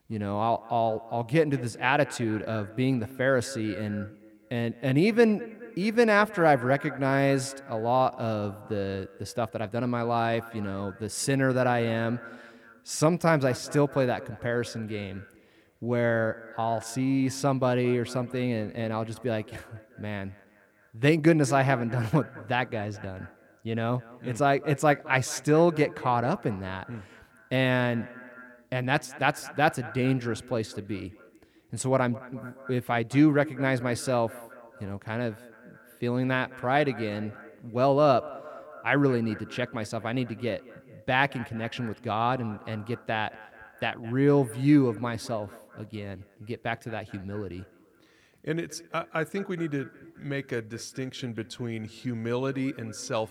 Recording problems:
echo of what is said; noticeable; throughout; 210 ms later, 20 dB below the speech

